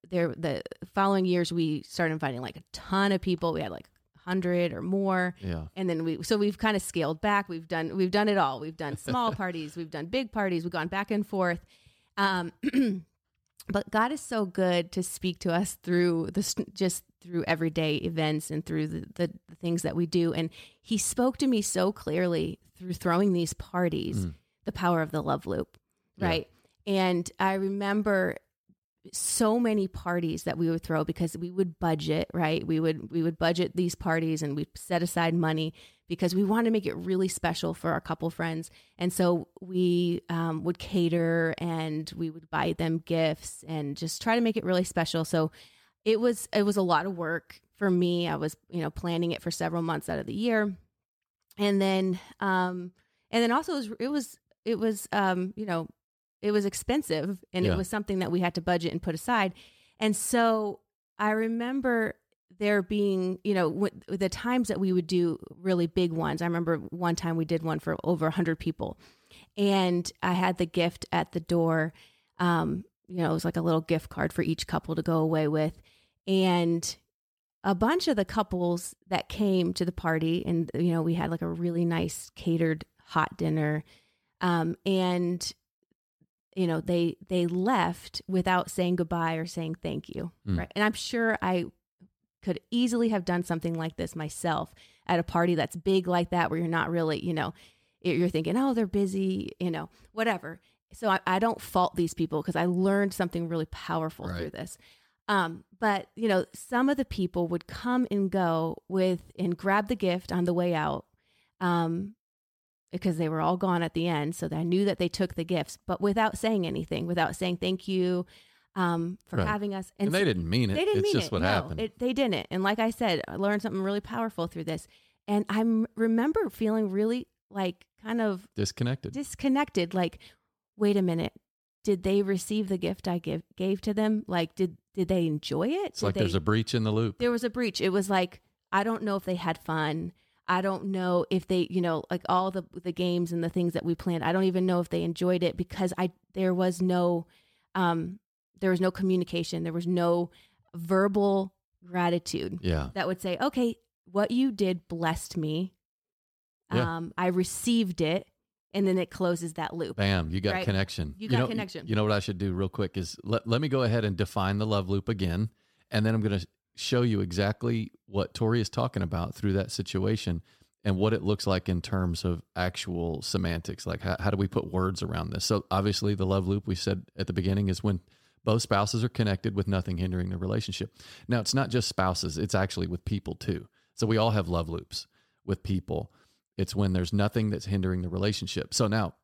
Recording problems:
none

